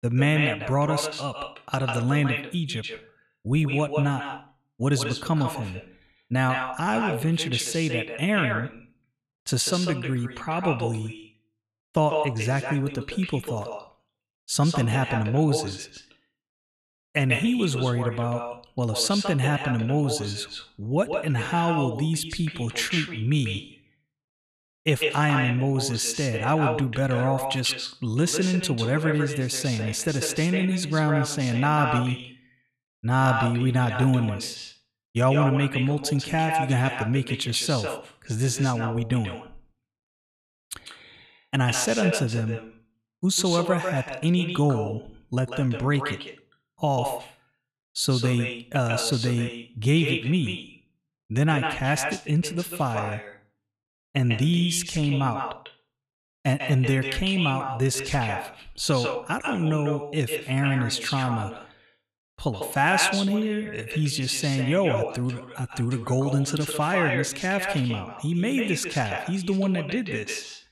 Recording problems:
echo of what is said; strong; throughout; 150 ms later, 6 dB below the speech

